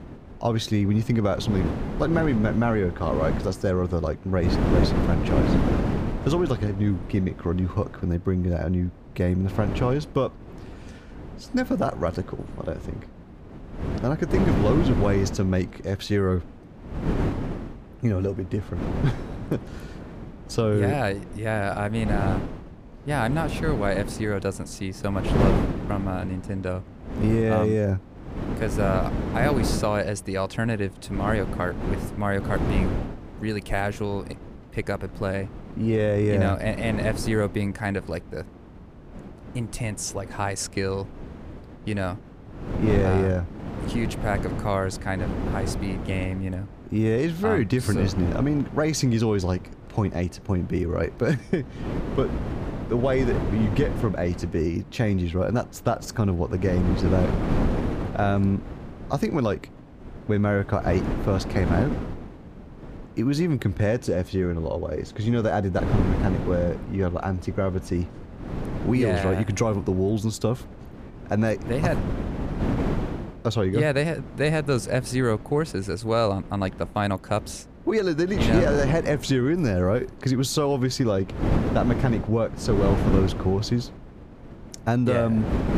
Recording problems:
wind noise on the microphone; heavy; 7 dB below the speech

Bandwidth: 15 kHz